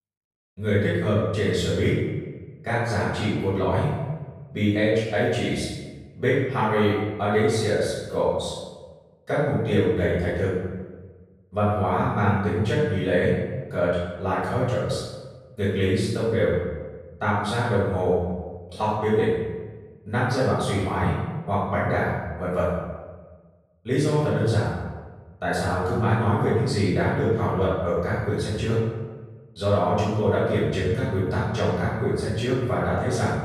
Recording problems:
room echo; strong; dies away in 1.1 s
off-mic speech; far

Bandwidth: 15 kHz